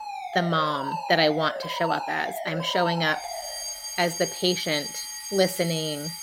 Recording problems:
alarms or sirens; loud; throughout; 7 dB below the speech

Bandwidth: 16 kHz